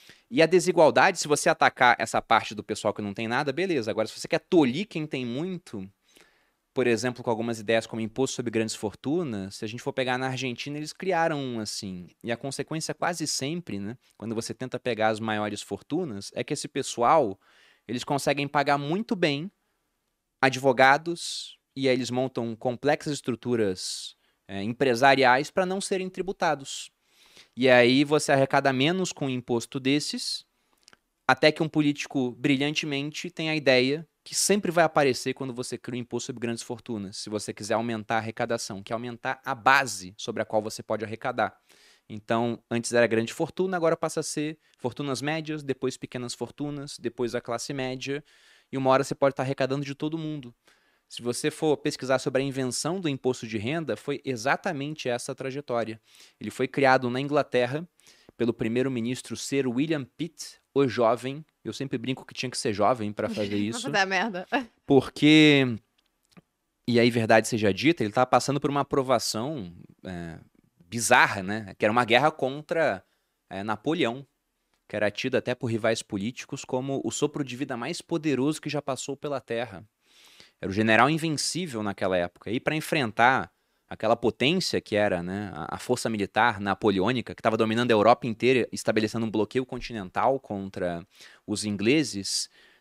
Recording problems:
none

